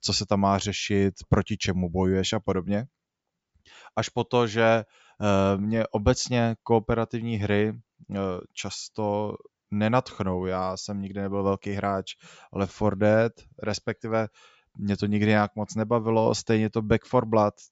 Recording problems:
high frequencies cut off; noticeable; nothing above 8 kHz

